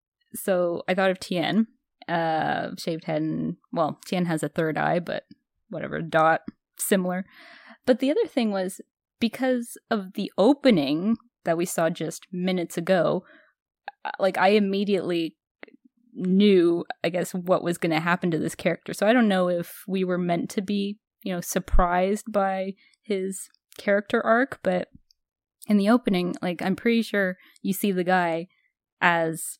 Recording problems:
none

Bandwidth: 16 kHz